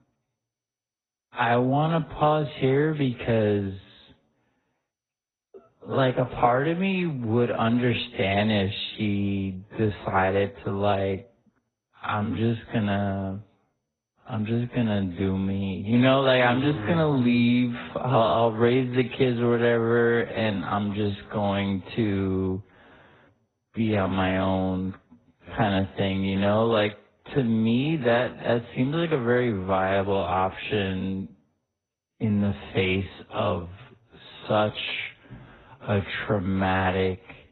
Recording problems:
garbled, watery; badly; nothing above 4 kHz
wrong speed, natural pitch; too slow; 0.6 times normal speed

